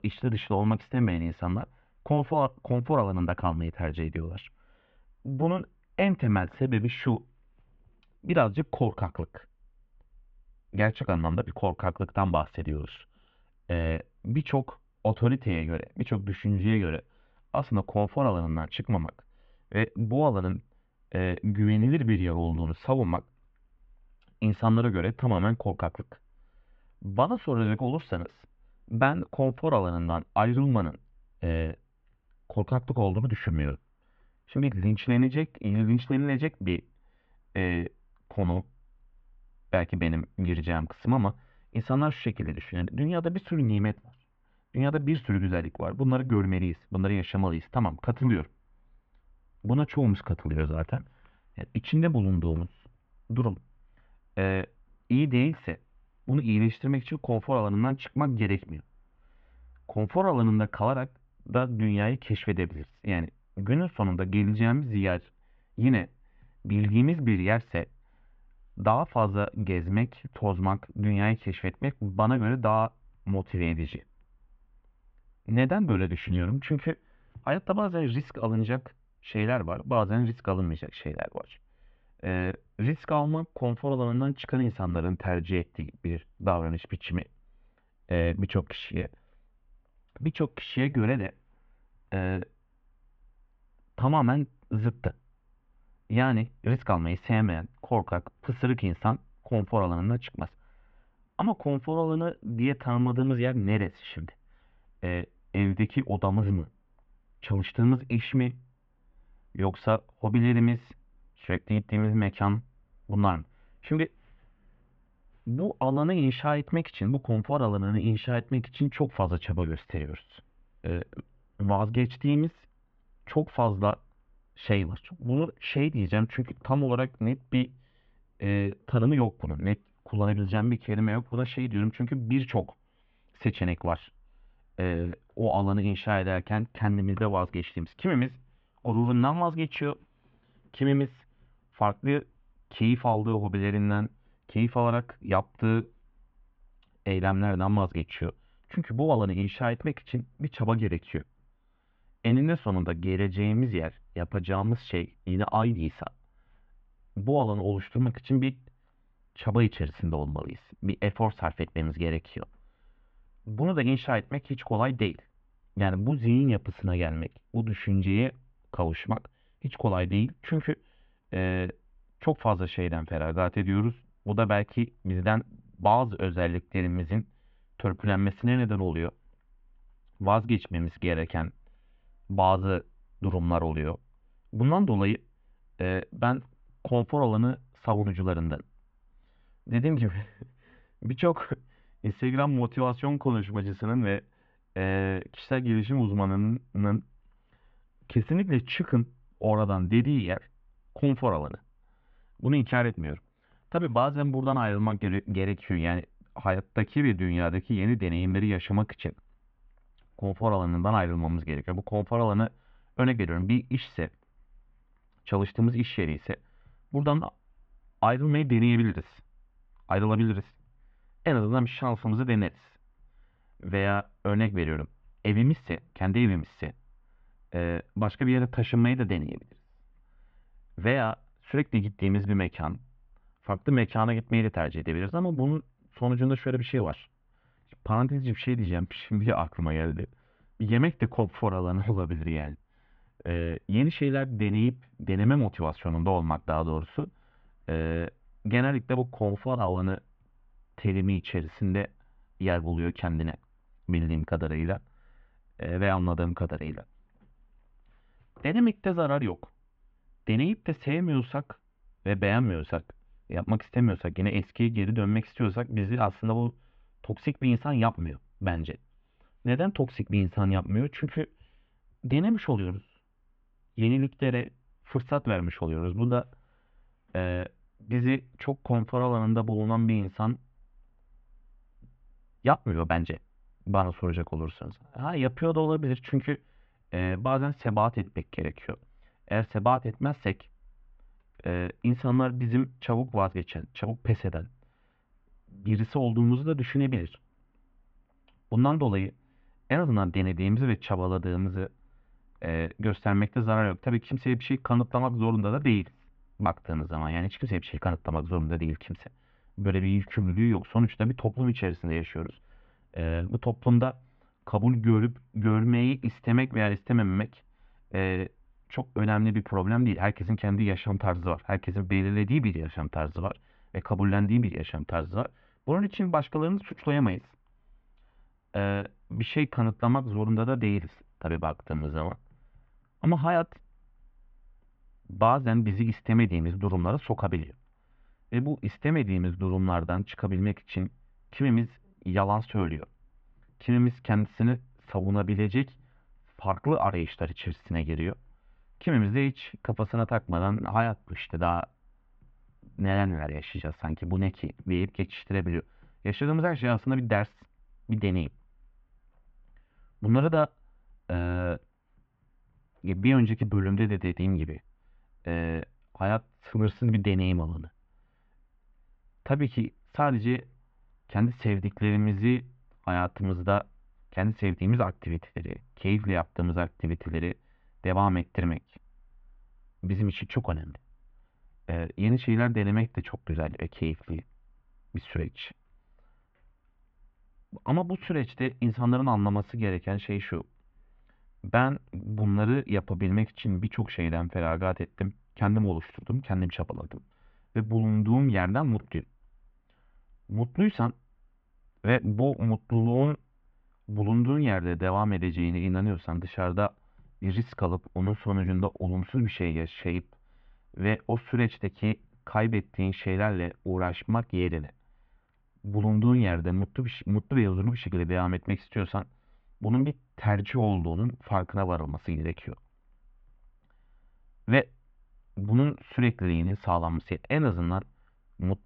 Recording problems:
muffled; very; fading above 3 kHz

